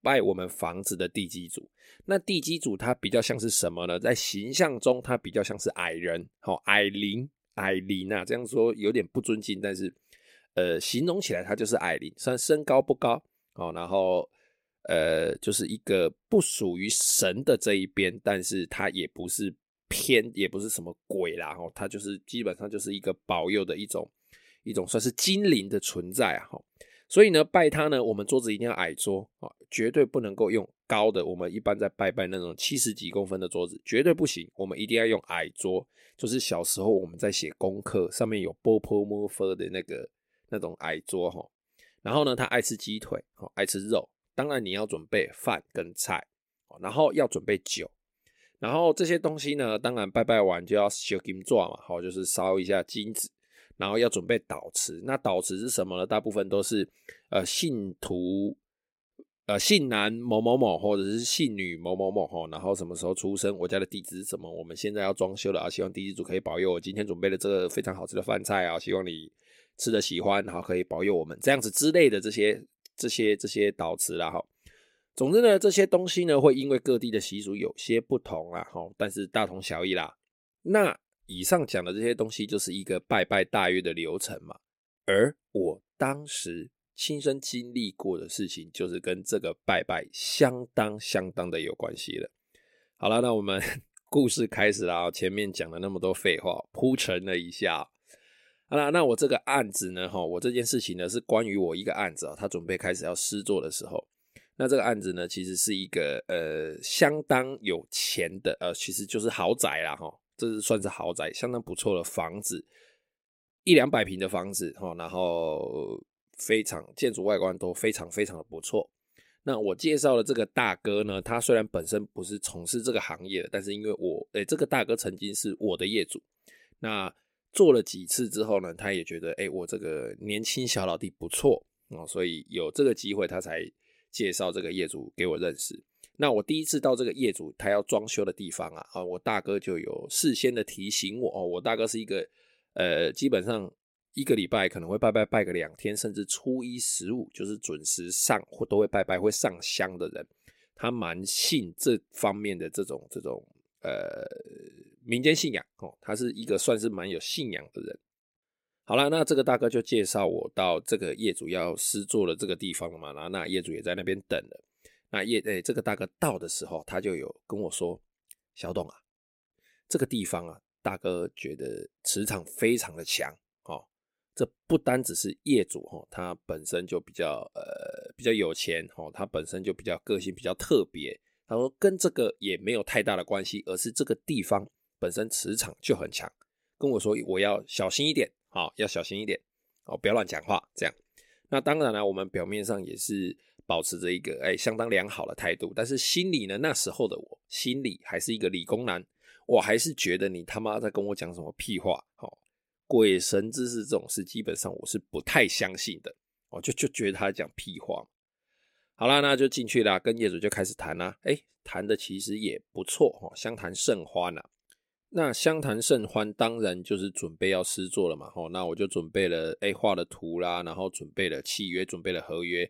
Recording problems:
none

